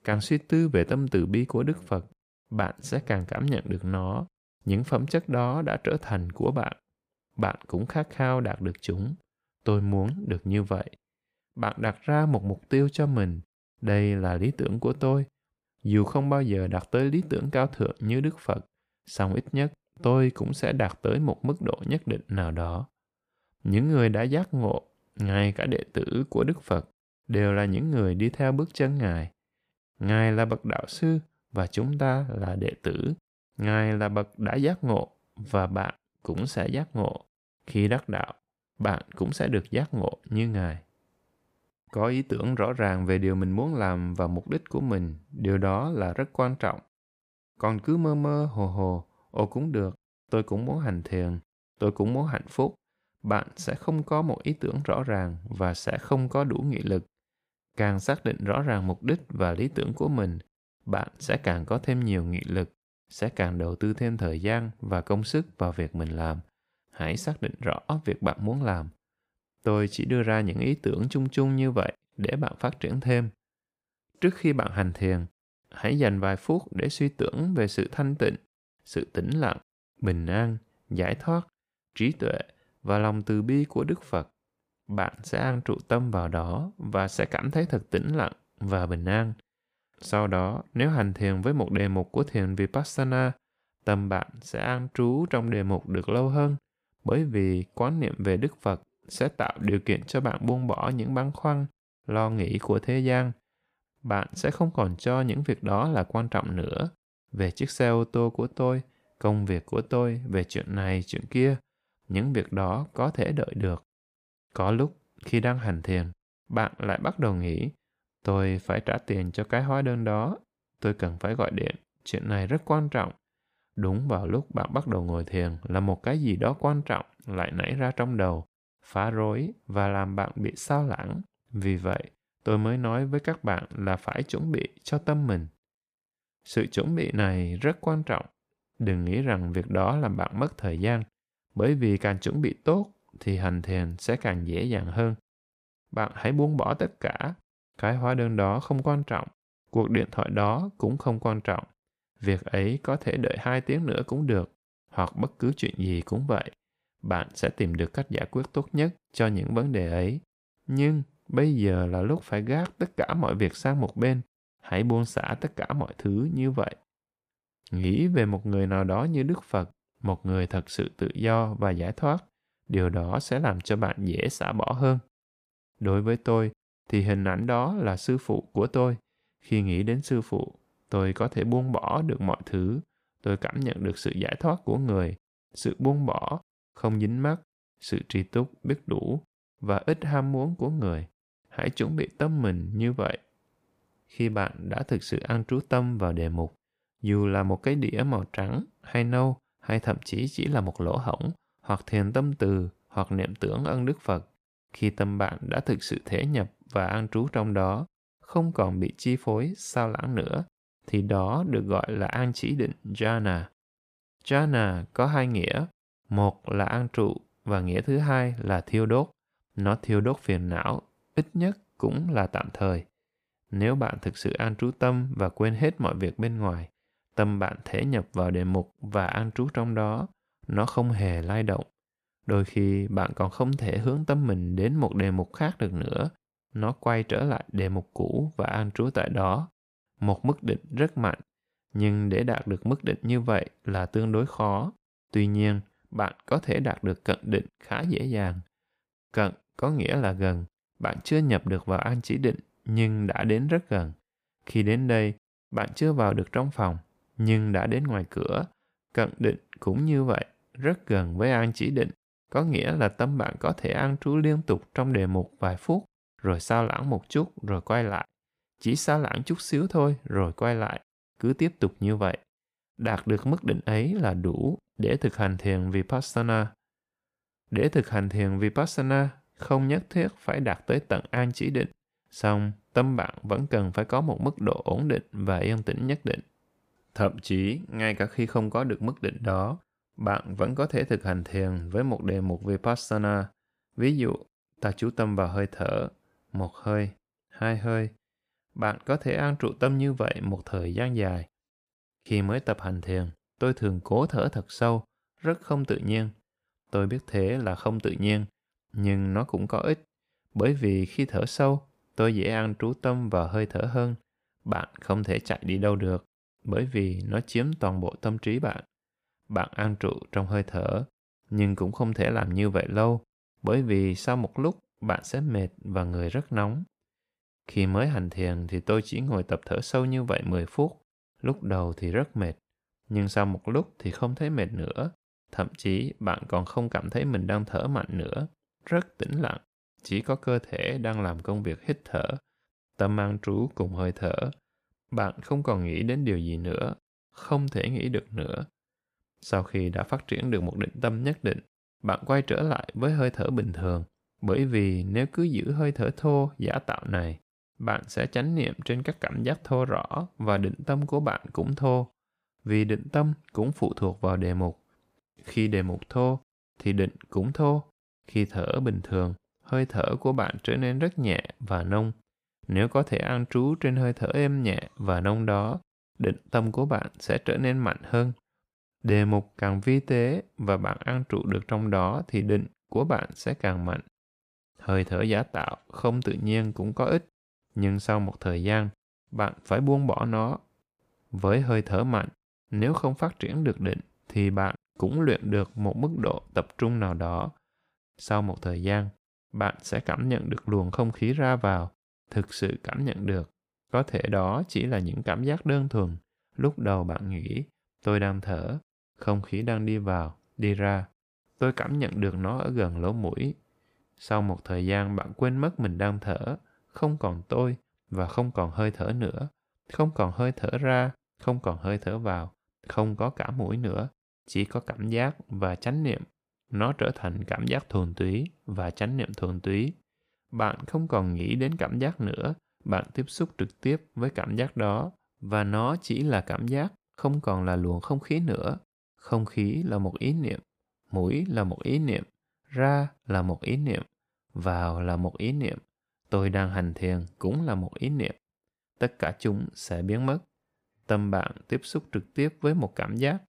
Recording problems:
none

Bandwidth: 15 kHz